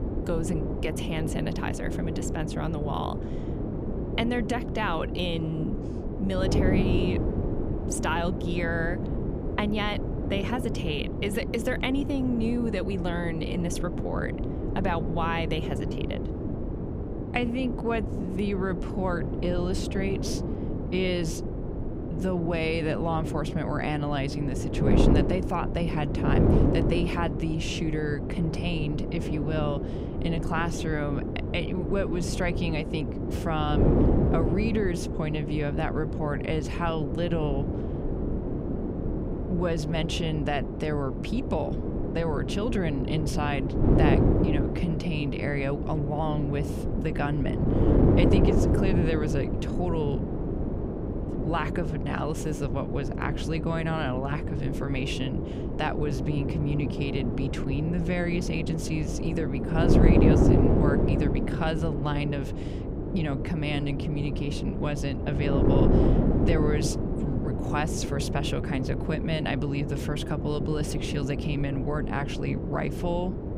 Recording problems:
wind noise on the microphone; heavy; 2 dB below the speech

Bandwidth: 15.5 kHz